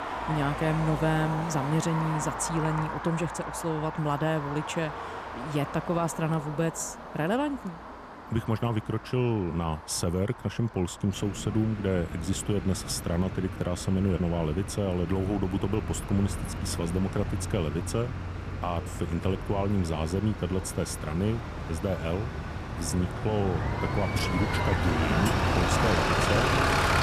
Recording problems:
traffic noise; loud; throughout; 3 dB below the speech

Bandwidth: 14 kHz